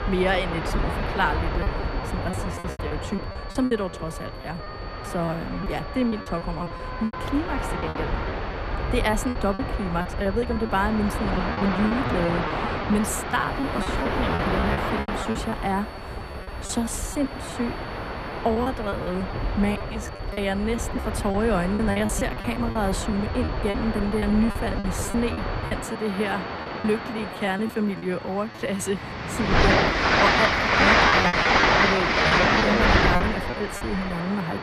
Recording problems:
train or aircraft noise; very loud; throughout; 2 dB above the speech
background music; noticeable; throughout; 15 dB below the speech
high-pitched whine; faint; throughout; 4.5 kHz, 20 dB below the speech
background chatter; faint; throughout; 4 voices, 25 dB below the speech
choppy; very; 12% of the speech affected

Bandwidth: 14 kHz